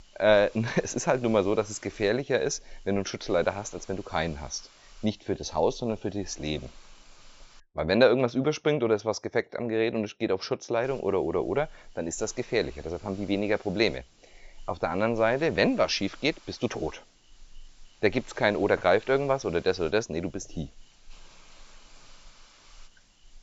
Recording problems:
high frequencies cut off; noticeable; nothing above 8 kHz
hiss; faint; until 7.5 s and from 11 s on; 25 dB below the speech

